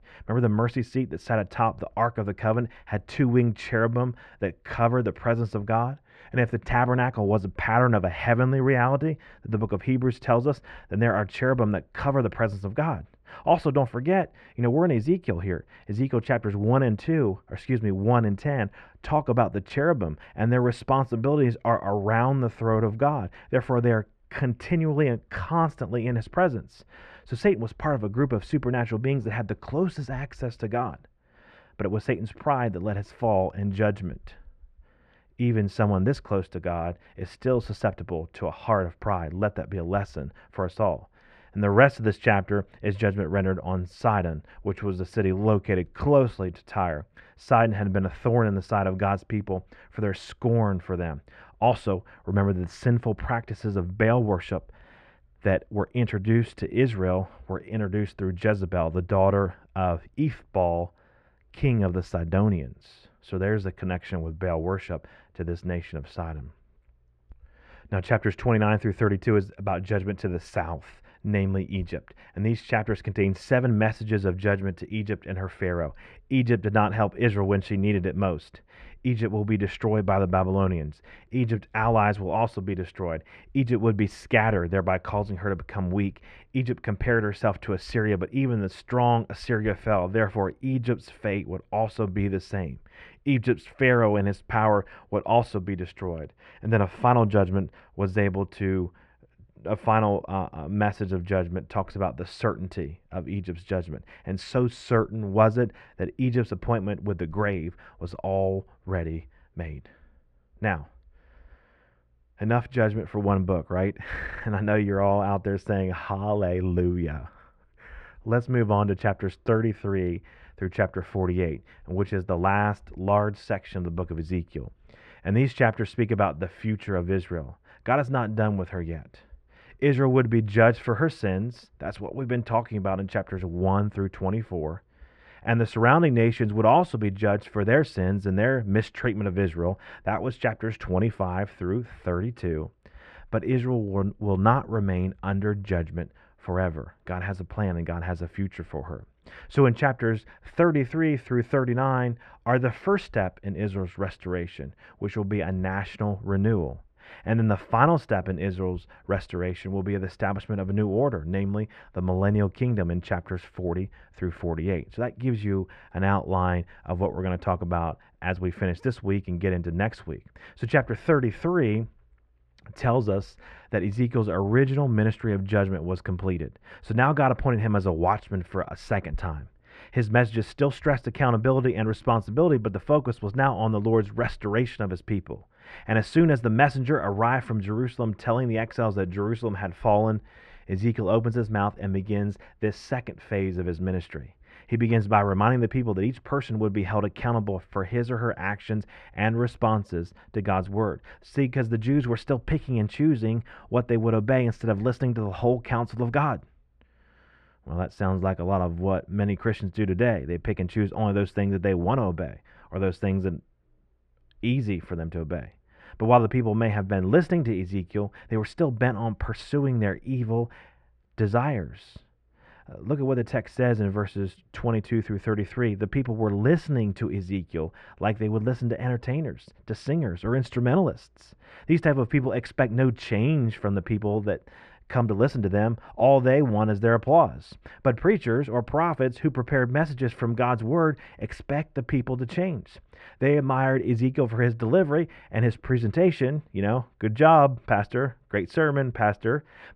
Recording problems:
muffled; very; fading above 1.5 kHz

